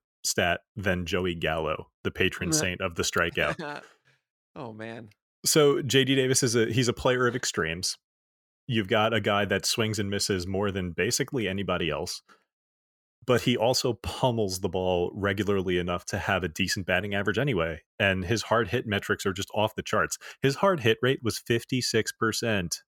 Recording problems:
none

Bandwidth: 17 kHz